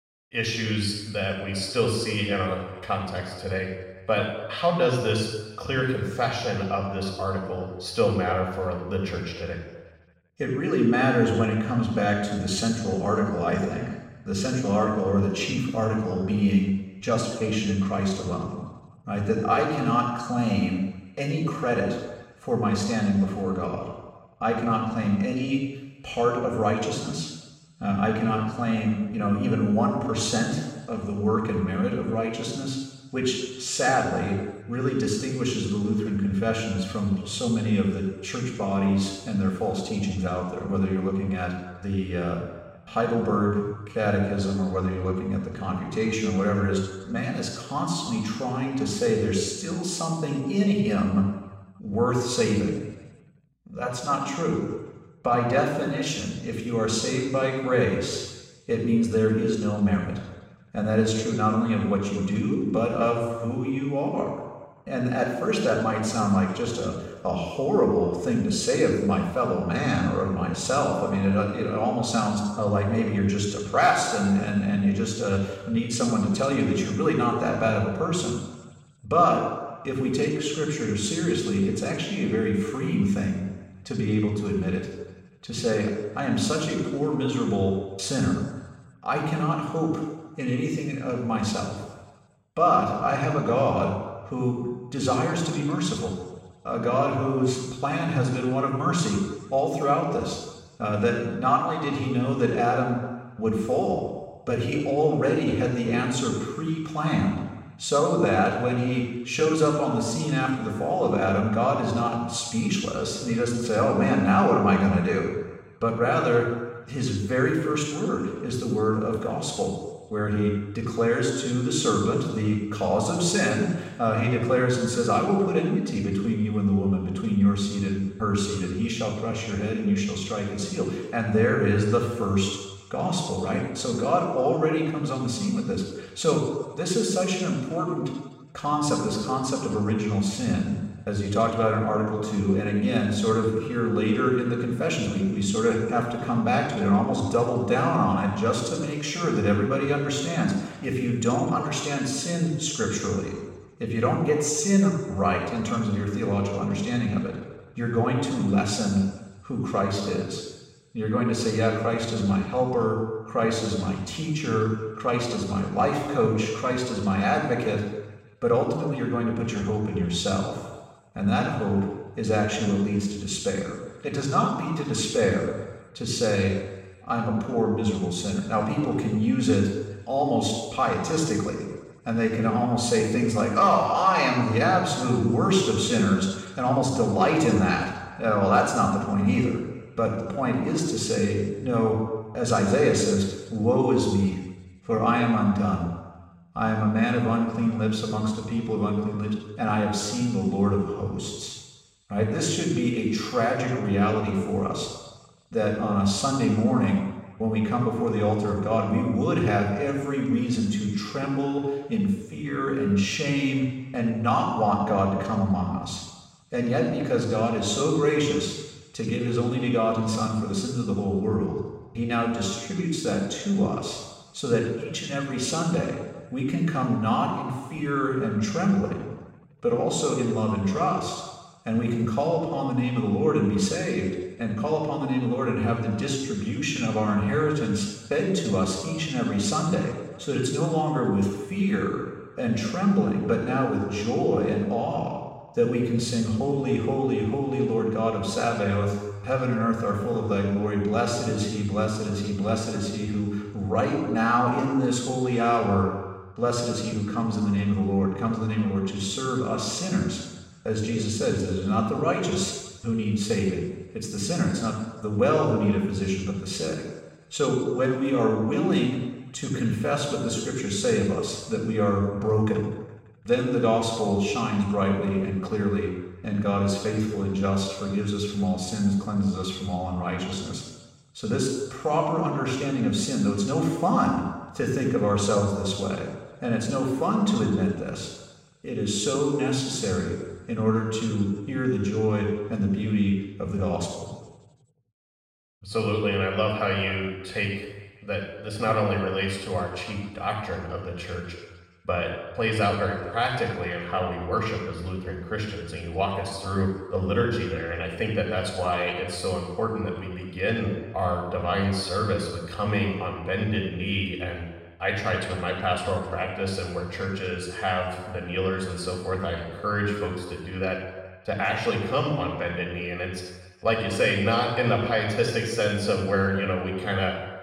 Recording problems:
off-mic speech; far
room echo; noticeable; dies away in 1.1 s

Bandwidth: 16.5 kHz